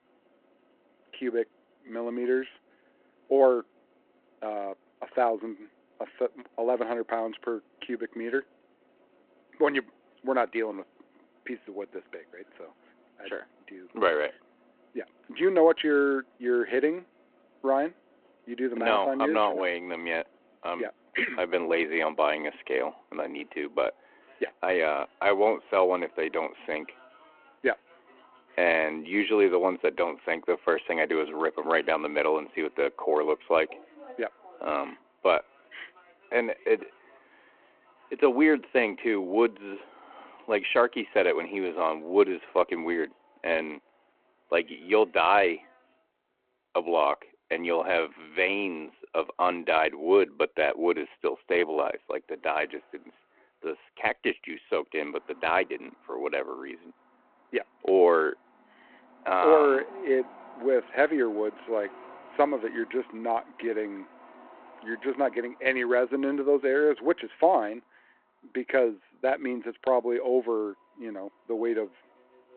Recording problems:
phone-call audio
traffic noise; faint; throughout; 30 dB below the speech

